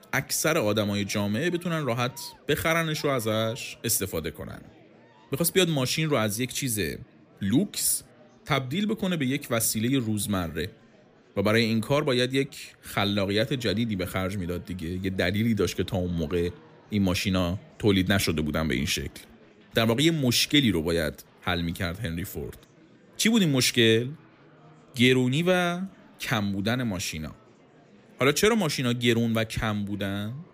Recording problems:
murmuring crowd; faint; throughout; 30 dB below the speech

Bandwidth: 15 kHz